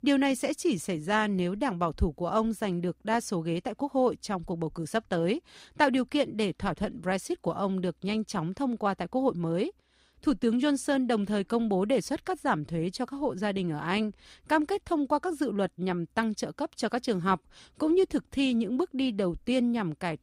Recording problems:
none

